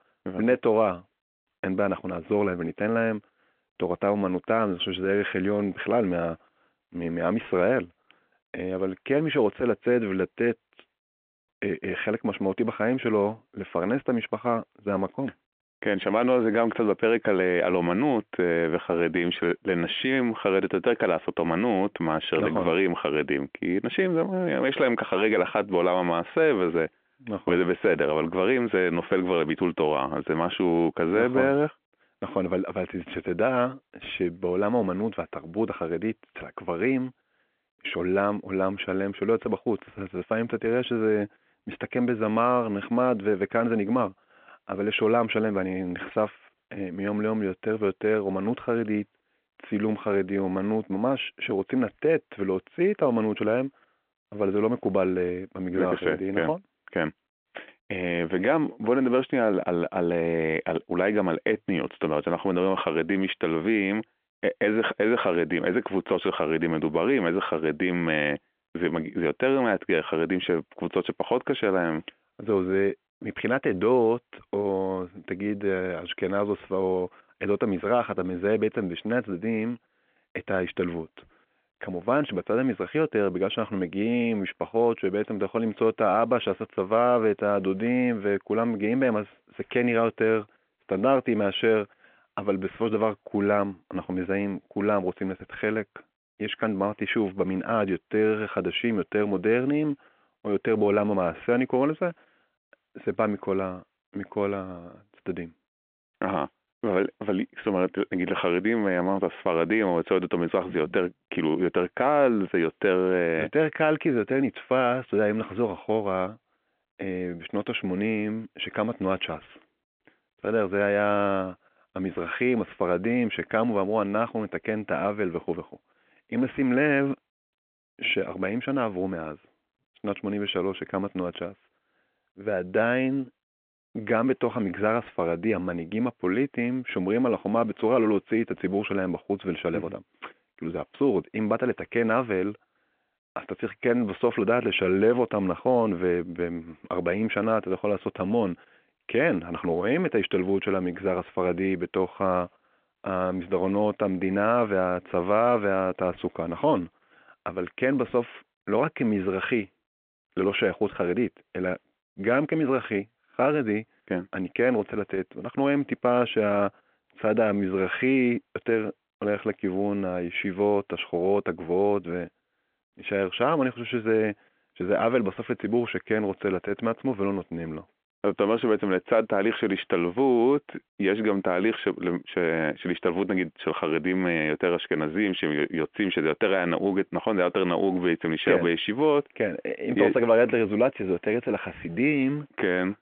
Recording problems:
phone-call audio; nothing above 3.5 kHz

